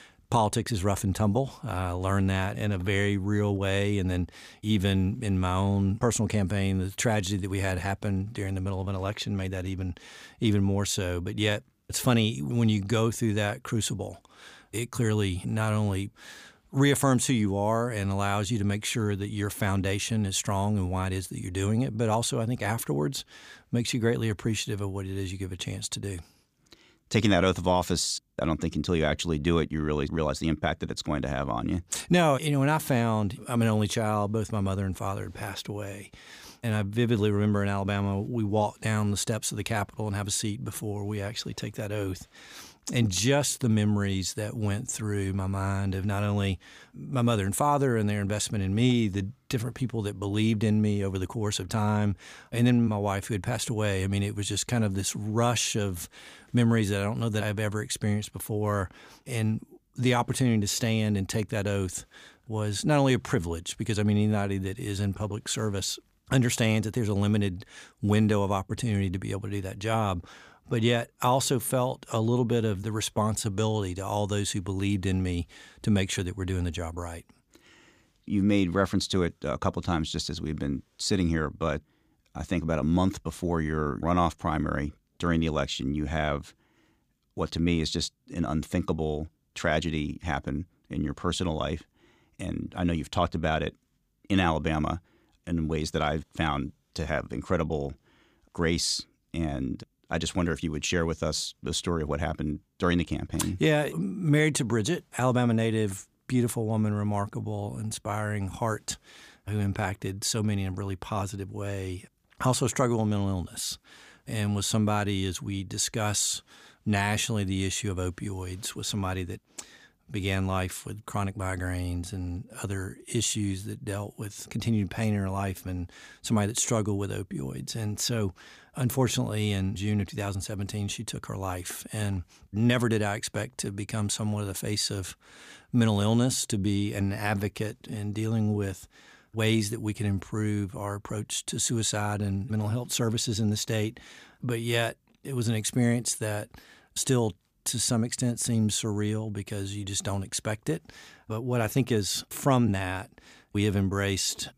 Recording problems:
none

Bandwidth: 15 kHz